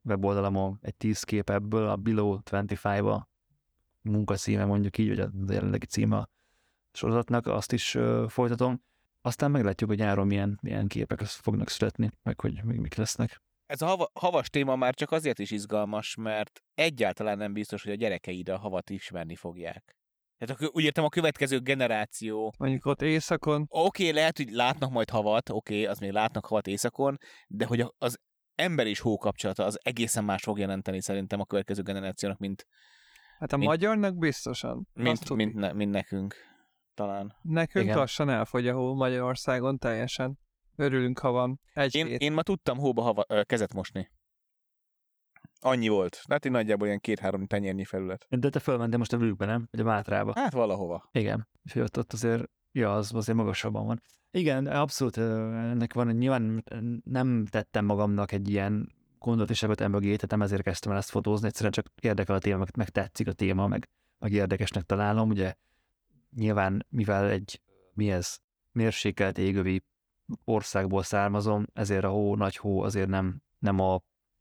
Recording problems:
none

